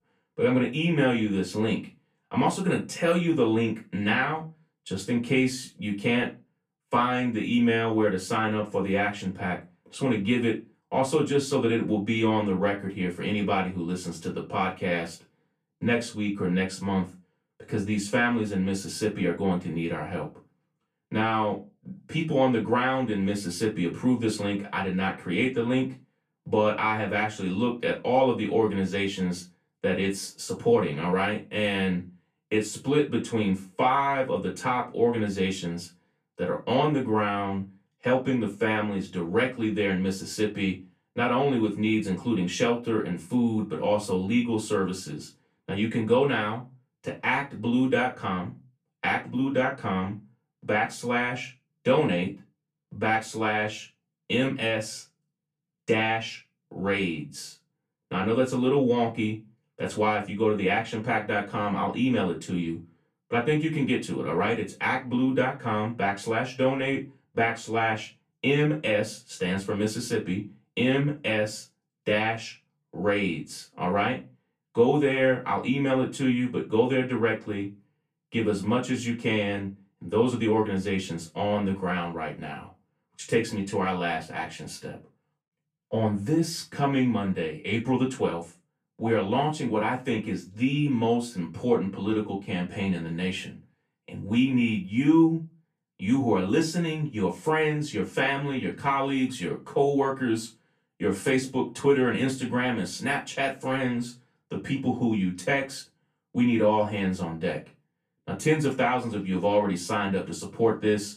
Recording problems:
off-mic speech; far
room echo; very slight; dies away in 0.2 s

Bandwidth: 14.5 kHz